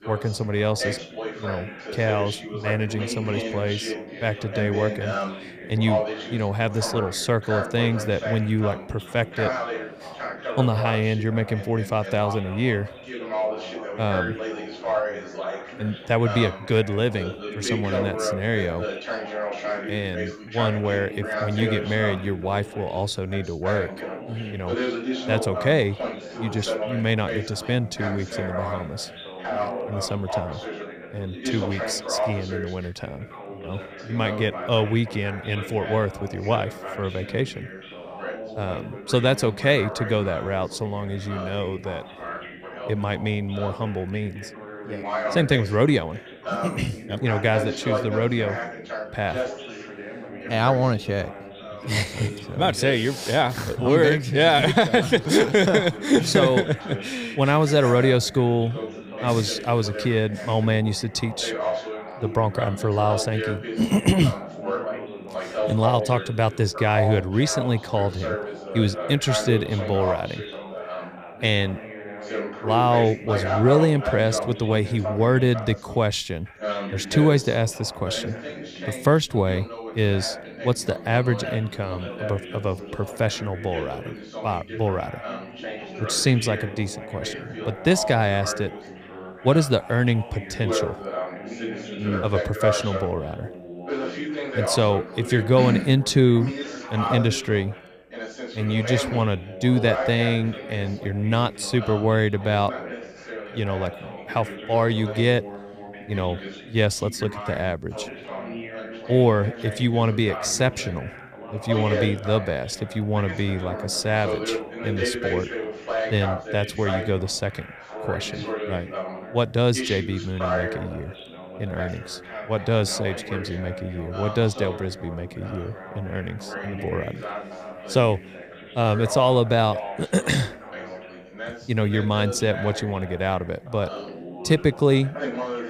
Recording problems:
background chatter; loud; throughout; 2 voices, 8 dB below the speech

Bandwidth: 15.5 kHz